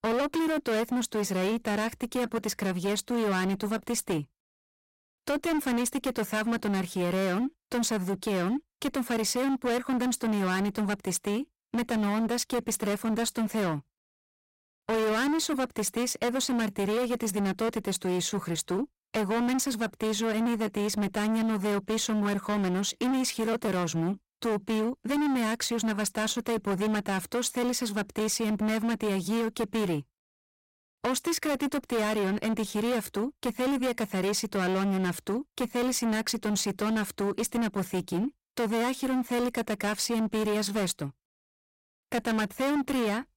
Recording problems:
distortion; heavy; 26% of the sound clipped

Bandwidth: 16 kHz